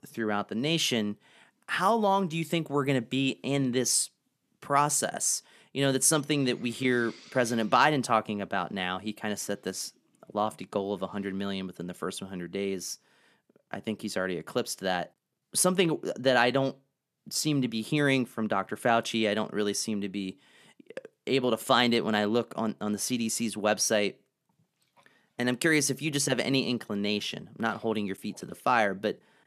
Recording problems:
none

